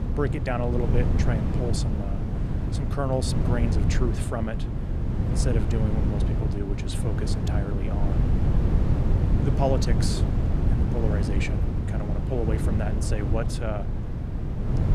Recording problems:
wind noise on the microphone; heavy; 3 dB below the speech

